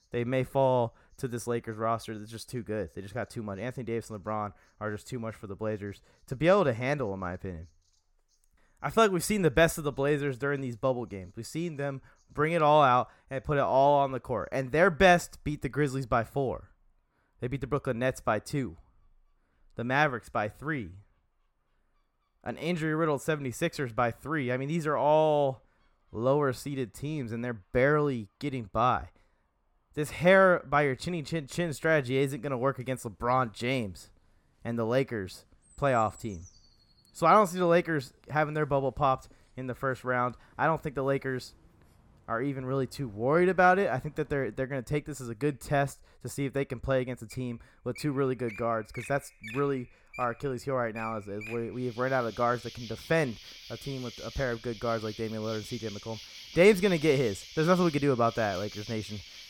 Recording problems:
animal sounds; noticeable; throughout; 15 dB below the speech

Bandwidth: 17.5 kHz